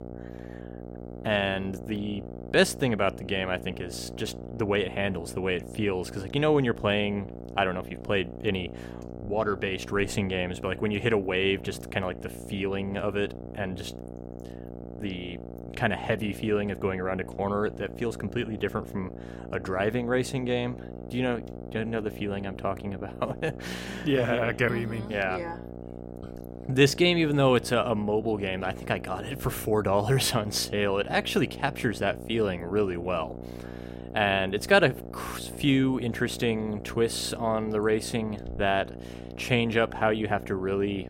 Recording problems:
electrical hum; noticeable; throughout; 60 Hz, 15 dB below the speech

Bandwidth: 16 kHz